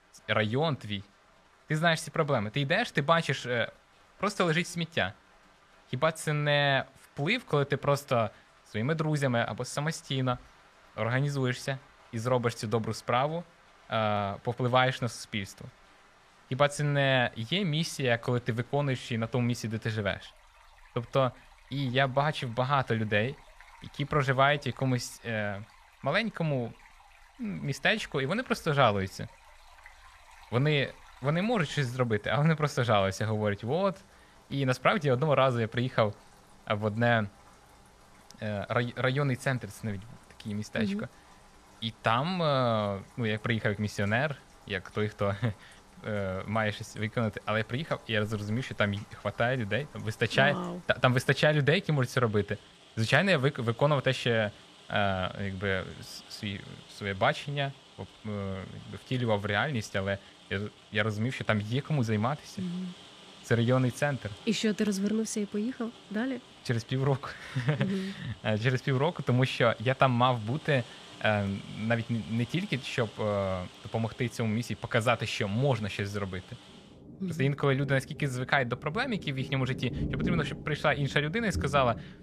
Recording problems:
rain or running water; faint; throughout; 20 dB below the speech

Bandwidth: 14.5 kHz